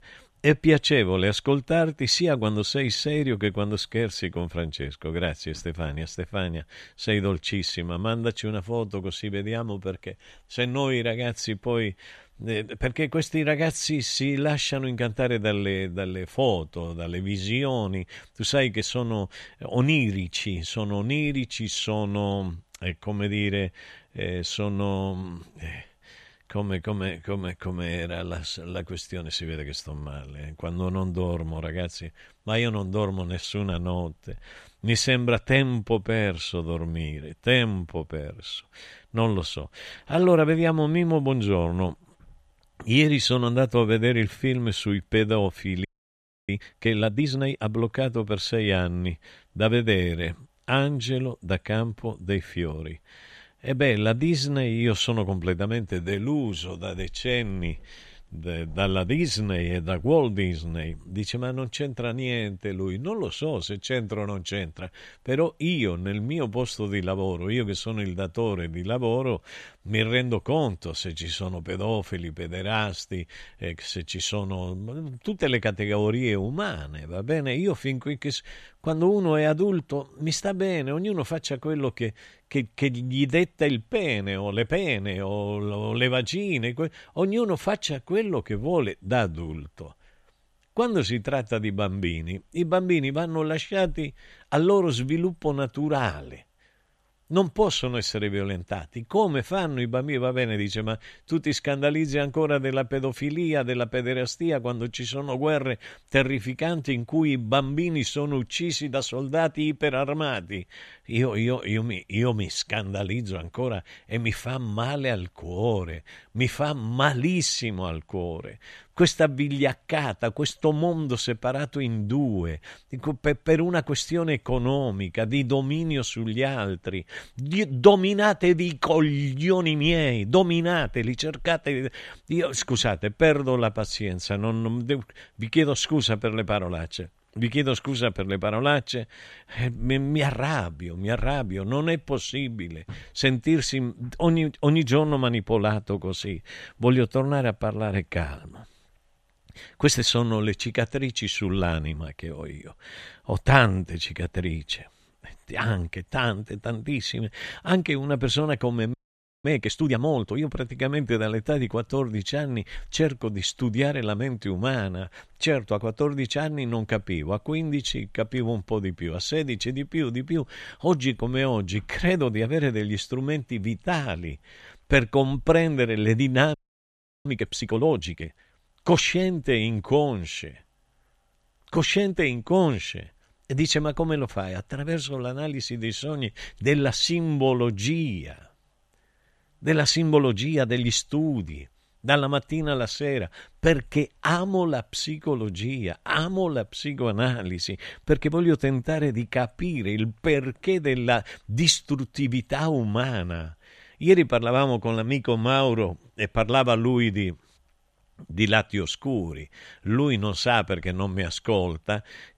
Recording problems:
audio freezing; at 46 s for 0.5 s, at 2:39 for 0.5 s and at 2:57 for 0.5 s

